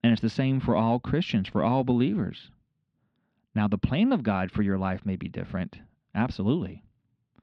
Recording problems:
muffled; slightly; fading above 3.5 kHz

